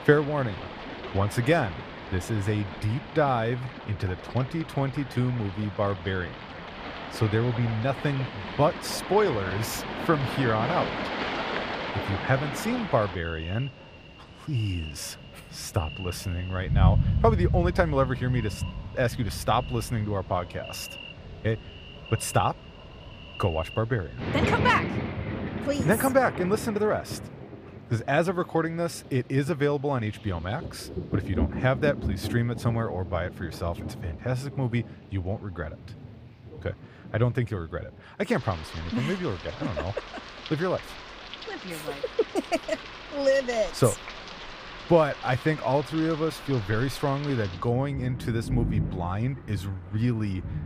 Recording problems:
rain or running water; loud; throughout; 7 dB below the speech

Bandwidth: 15 kHz